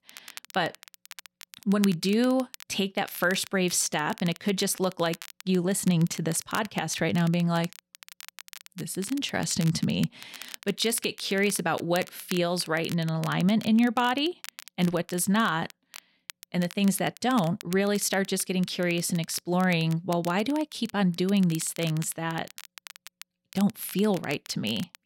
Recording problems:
crackle, like an old record; noticeable; 15 dB below the speech

